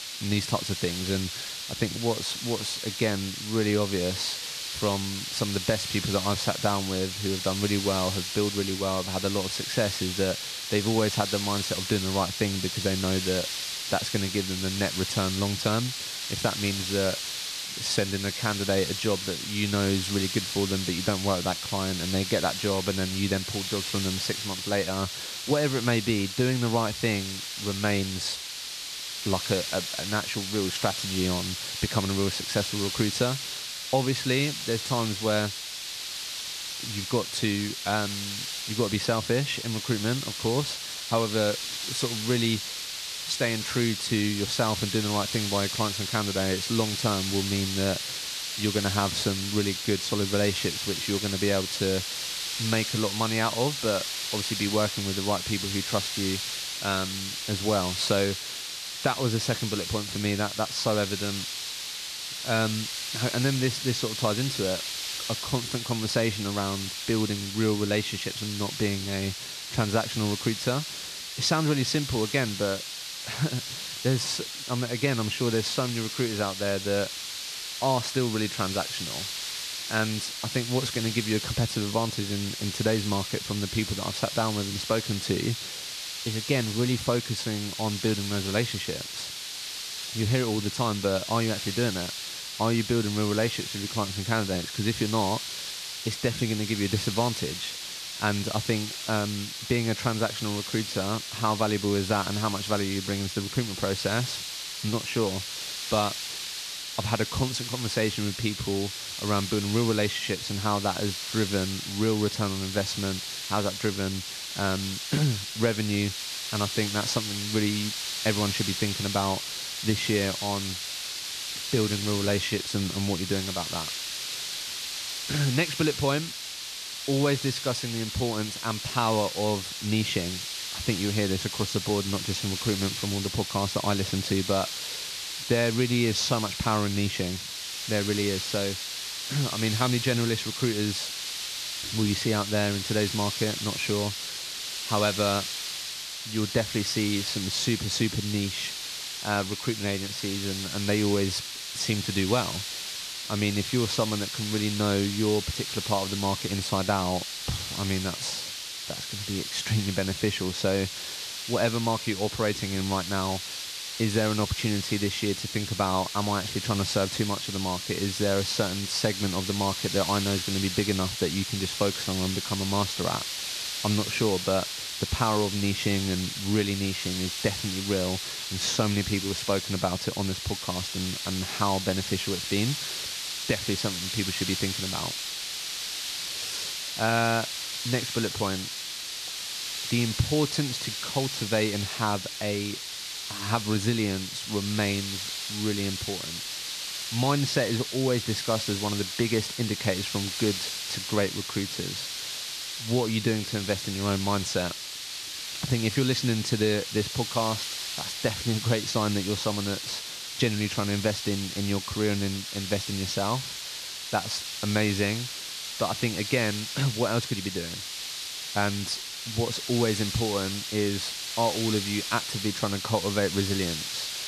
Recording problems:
hiss; loud; throughout; 3 dB below the speech

